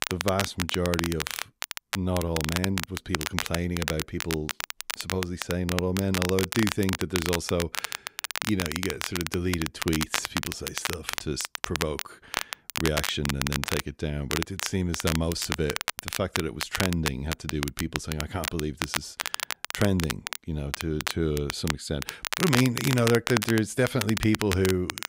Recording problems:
crackle, like an old record; loud; 3 dB below the speech

